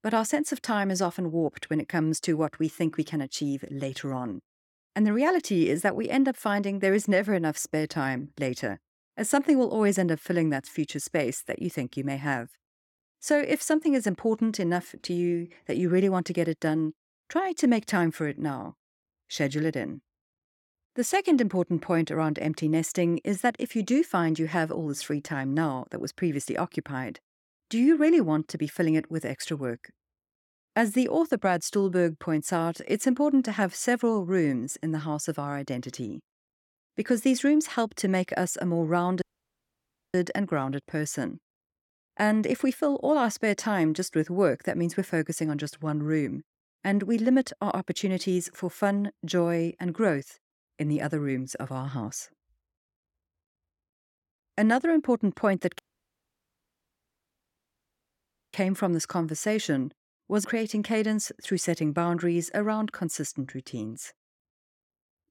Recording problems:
audio cutting out; at 39 s for 1 s and at 56 s for 2.5 s

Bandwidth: 17 kHz